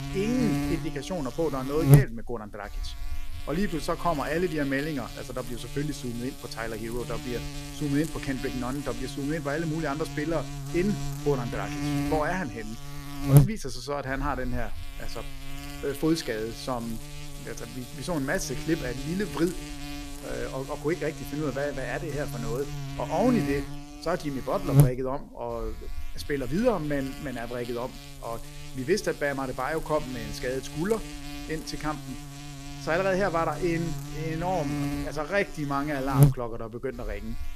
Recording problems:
electrical hum; loud; throughout; 50 Hz, 7 dB below the speech

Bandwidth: 14.5 kHz